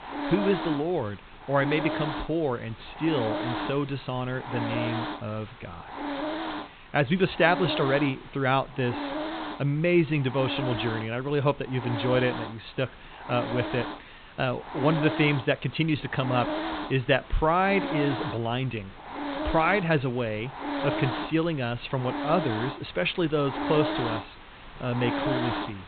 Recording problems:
high frequencies cut off; severe; nothing above 4 kHz
hiss; loud; throughout; 6 dB below the speech

